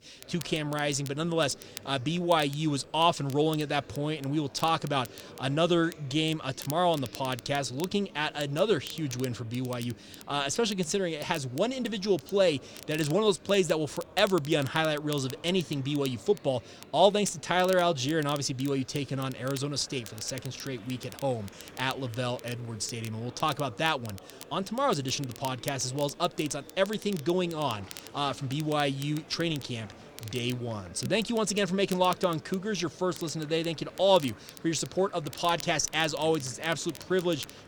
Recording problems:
crackle, like an old record; noticeable; 20 dB below the speech
murmuring crowd; faint; throughout; 20 dB below the speech

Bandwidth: 18.5 kHz